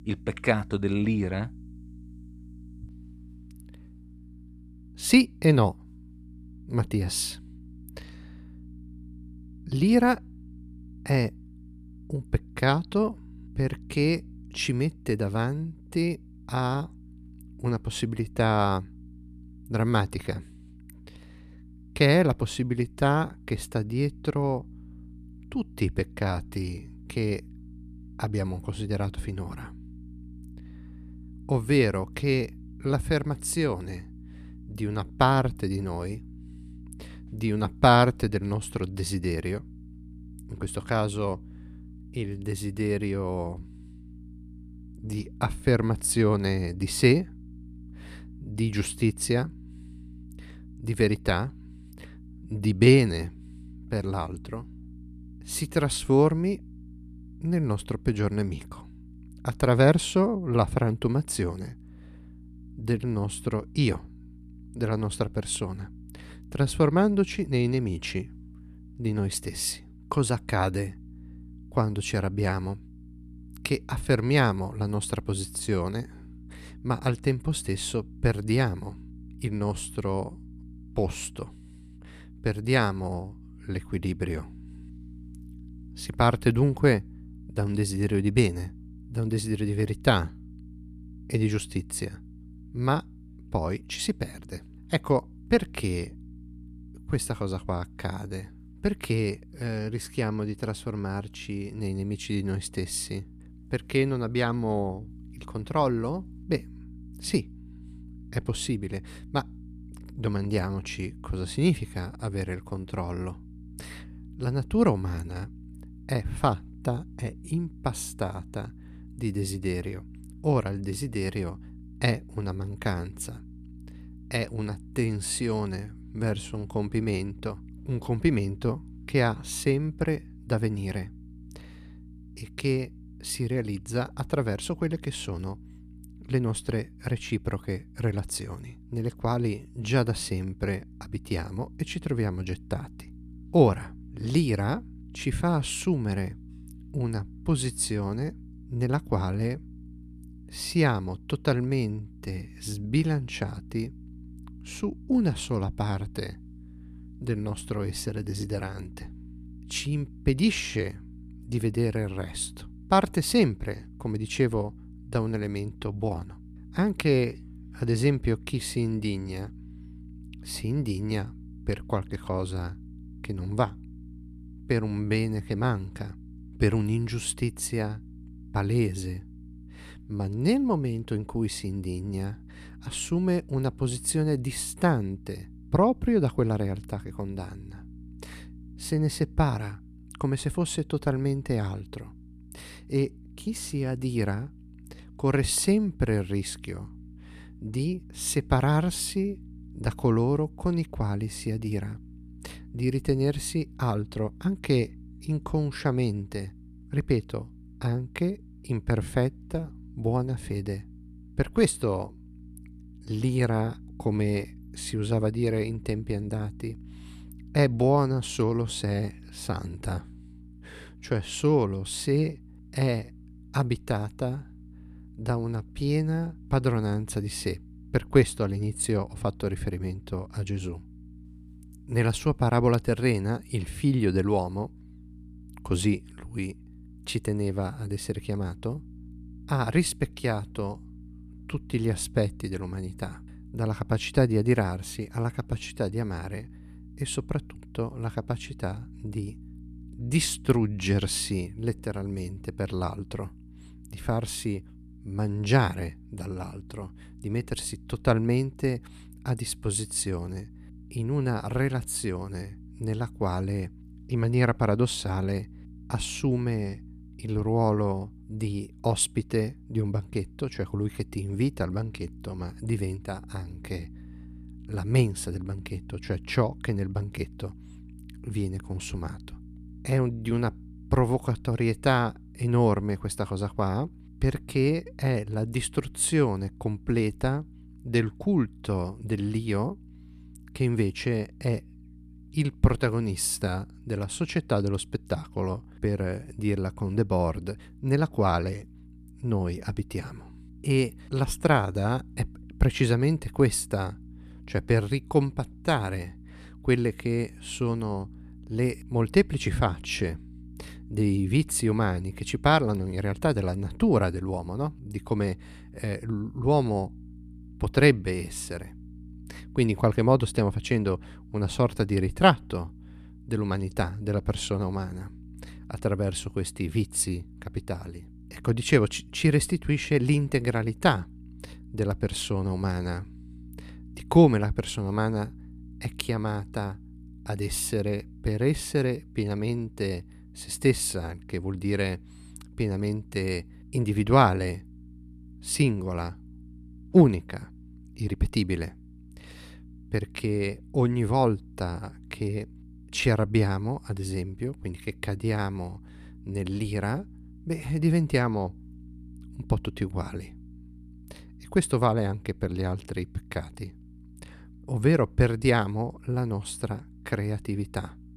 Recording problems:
electrical hum; faint; throughout; 60 Hz, 25 dB below the speech

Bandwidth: 14 kHz